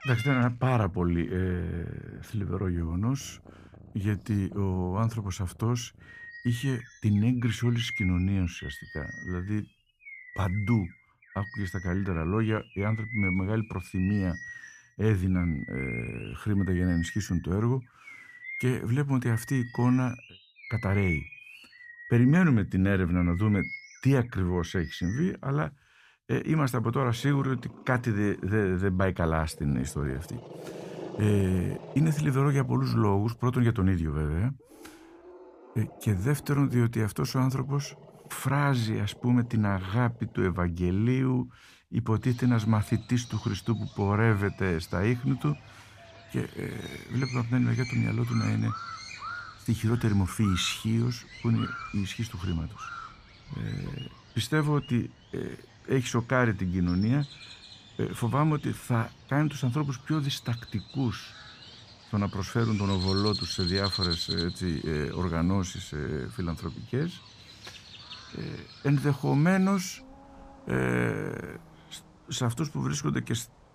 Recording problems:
animal sounds; noticeable; throughout; 15 dB below the speech

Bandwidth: 15 kHz